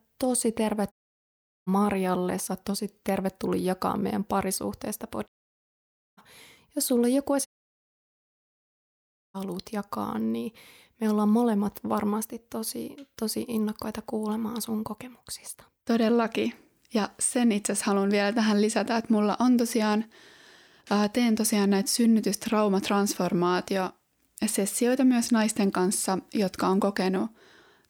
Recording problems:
audio cutting out; at 1 s for 0.5 s, at 5.5 s for 1 s and at 7.5 s for 2 s

